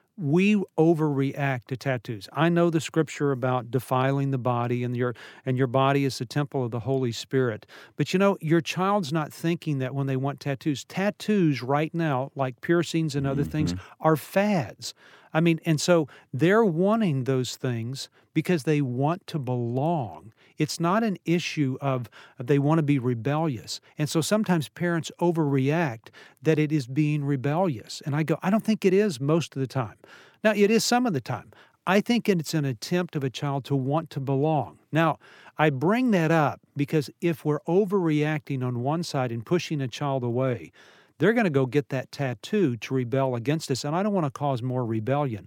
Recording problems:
none

